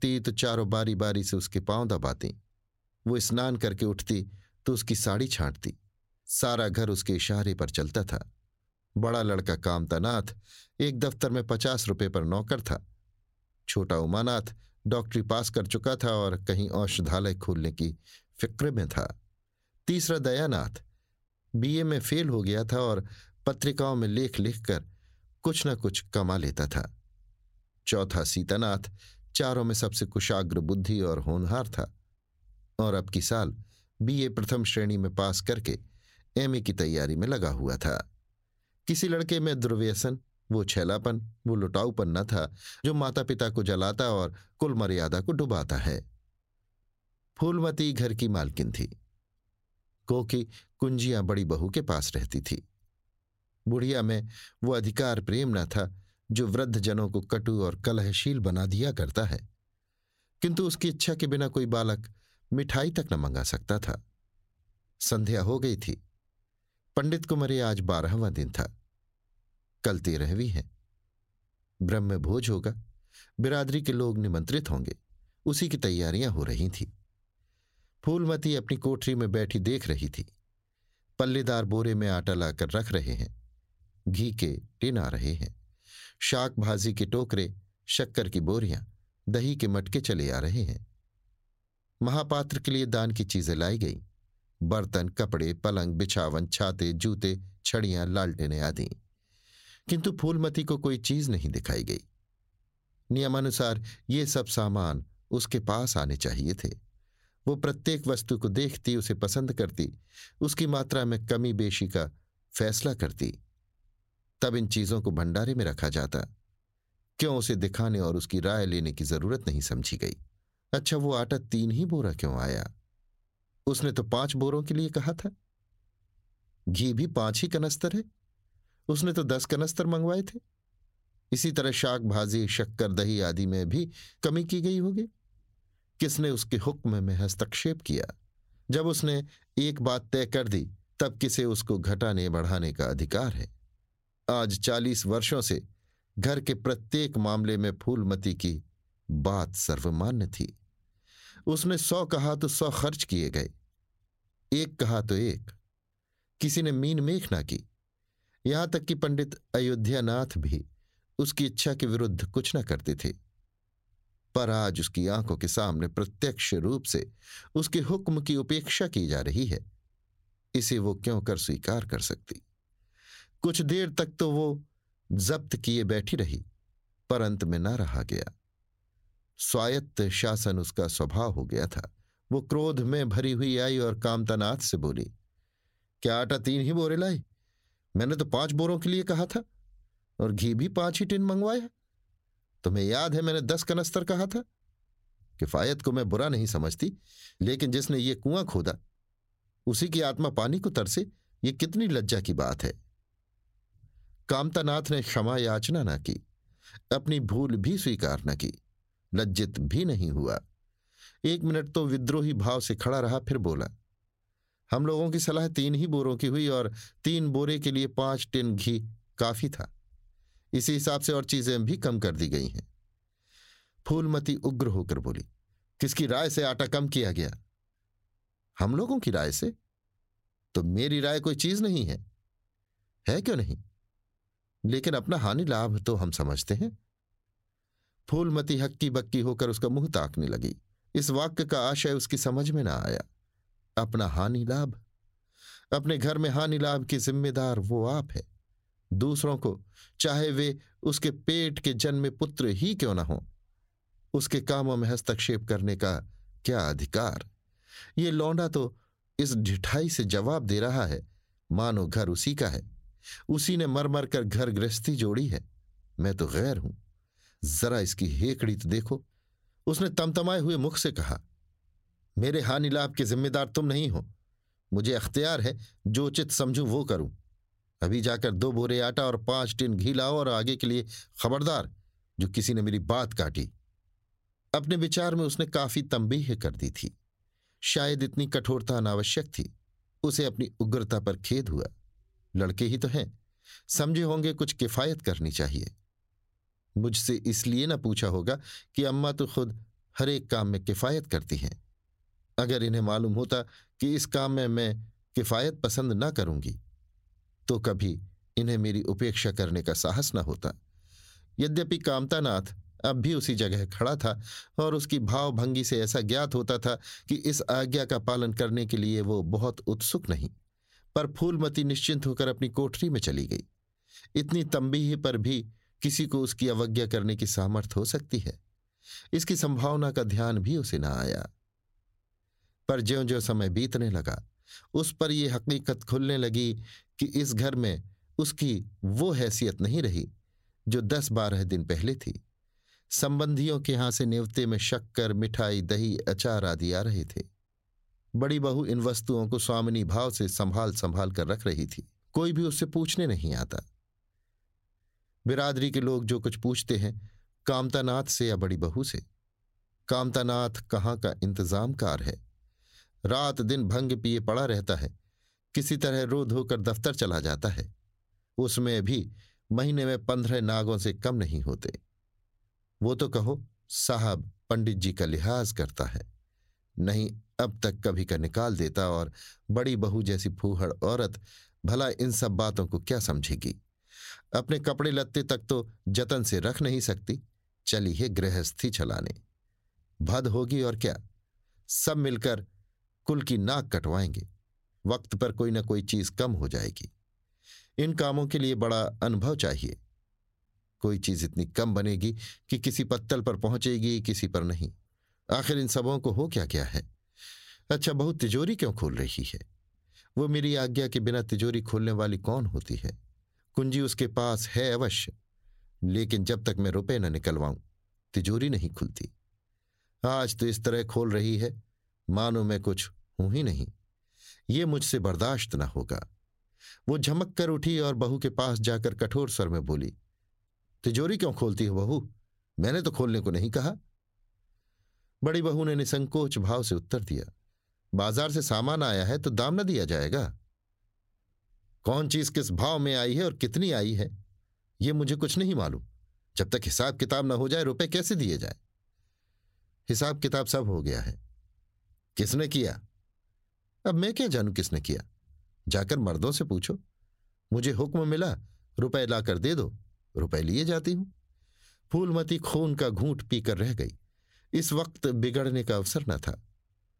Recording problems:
squashed, flat; somewhat

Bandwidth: 16 kHz